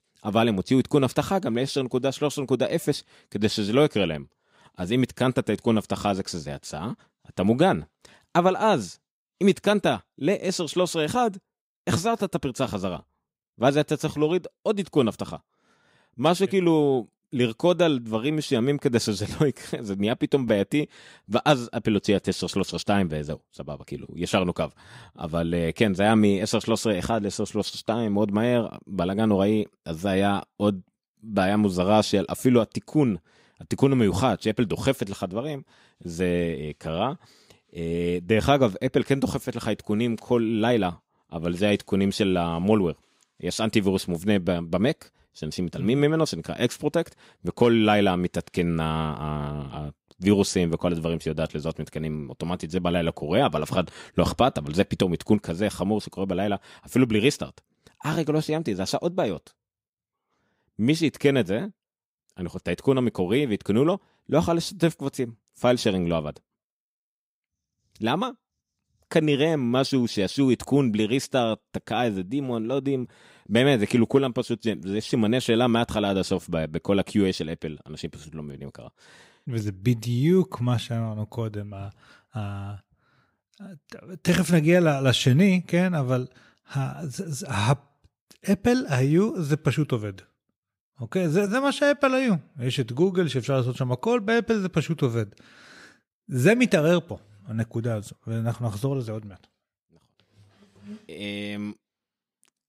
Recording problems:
none

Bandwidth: 15.5 kHz